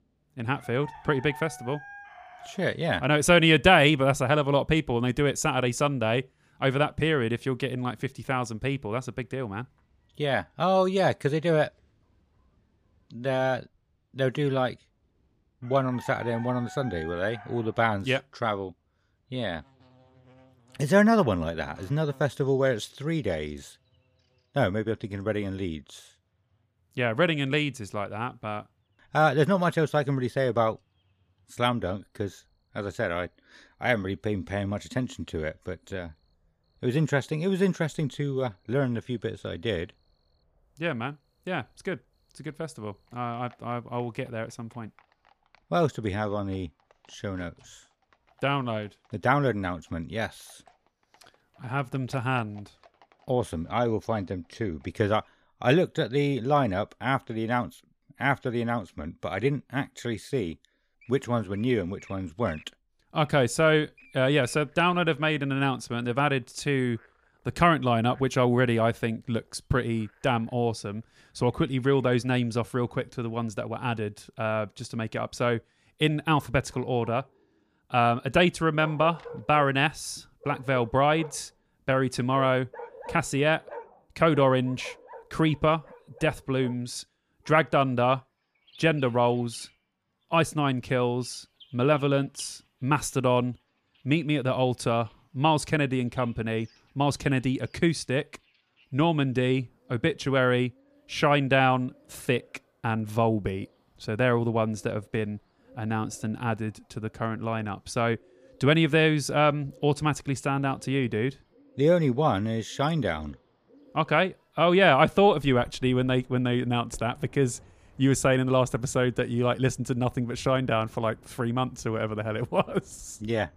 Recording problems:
animal sounds; faint; throughout; 25 dB below the speech

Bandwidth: 15 kHz